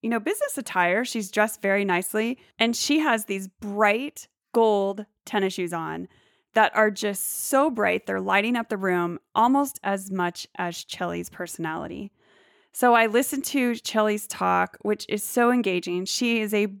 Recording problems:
none

